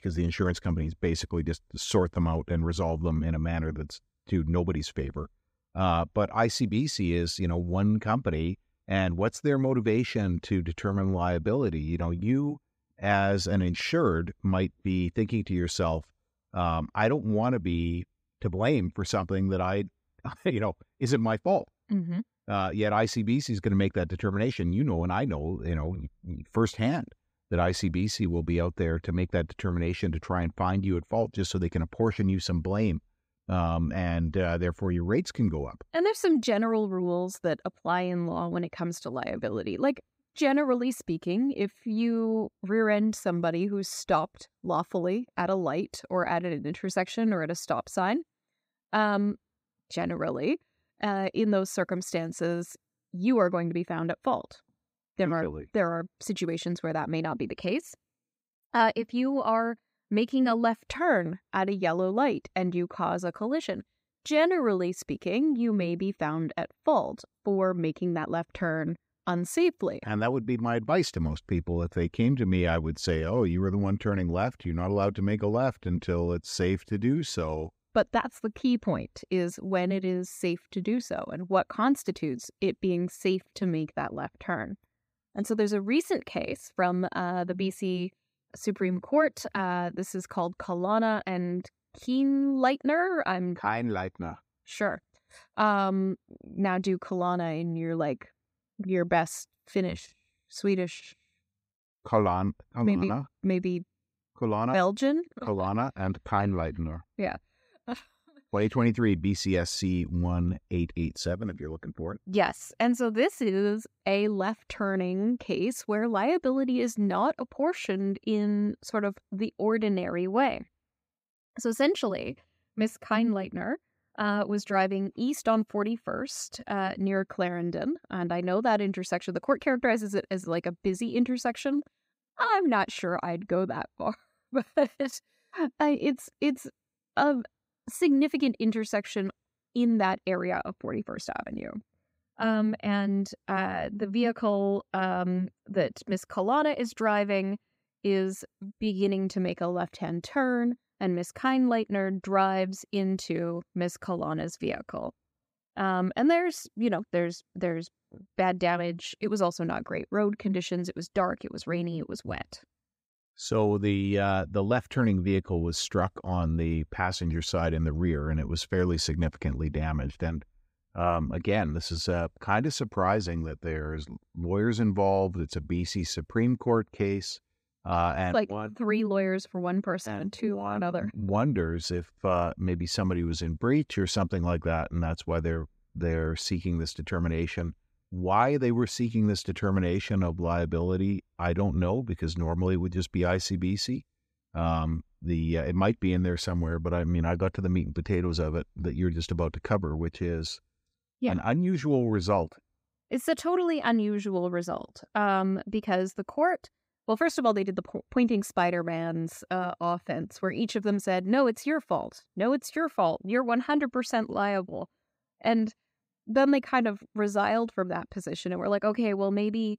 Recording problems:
none

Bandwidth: 15.5 kHz